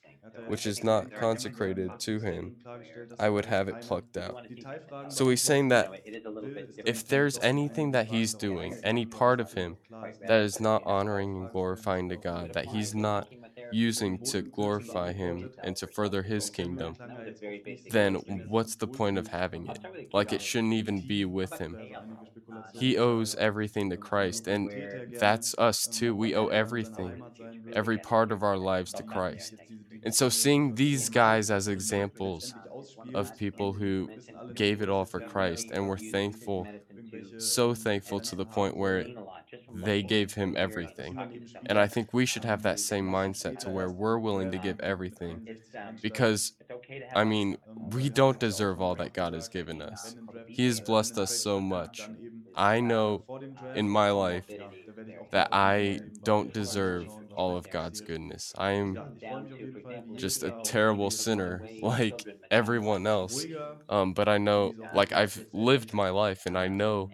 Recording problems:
background chatter; noticeable; throughout; 2 voices, 15 dB below the speech

